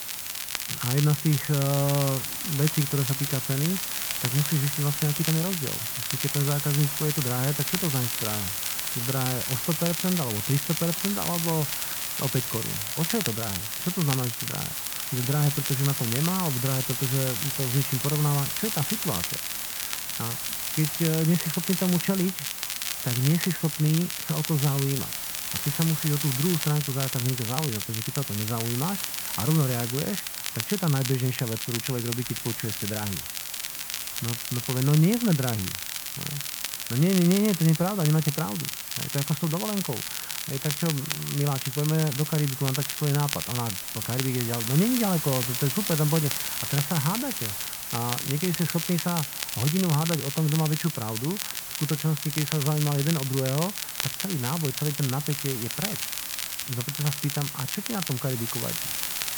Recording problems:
muffled; very; fading above 2 kHz
hiss; loud; throughout; 3 dB below the speech
crackle, like an old record; loud; 5 dB below the speech

